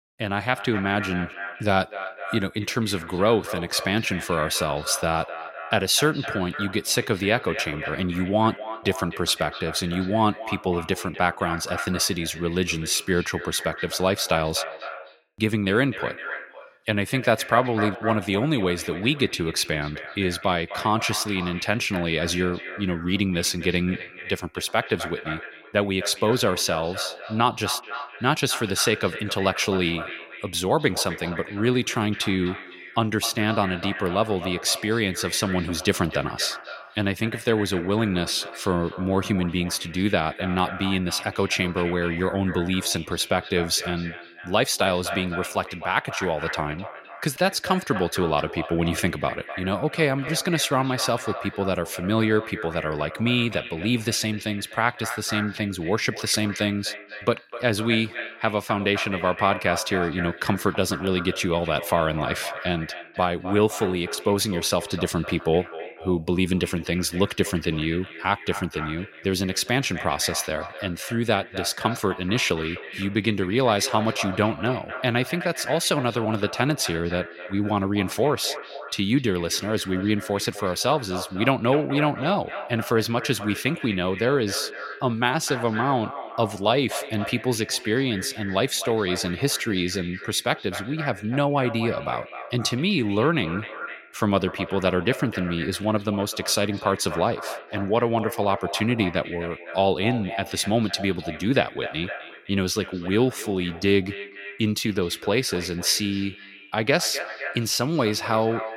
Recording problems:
echo of what is said; strong; throughout; 250 ms later, 10 dB below the speech

